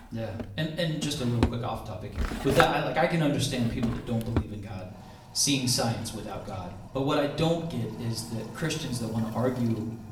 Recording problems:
off-mic speech; far
room echo; slight; dies away in 0.7 s
household noises; loud; throughout; 7 dB below the speech

